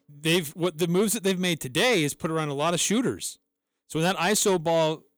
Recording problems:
distortion; slight; 10 dB below the speech

